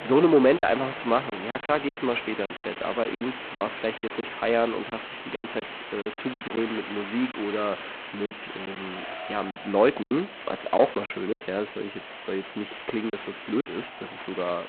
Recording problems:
phone-call audio; poor line; nothing above 4 kHz
distortion; slight; 10 dB below the speech
traffic noise; noticeable; throughout; 20 dB below the speech
hiss; noticeable; throughout; 10 dB below the speech
choppy; very; 9% of the speech affected

